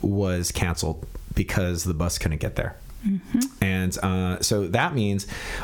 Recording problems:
squashed, flat; heavily

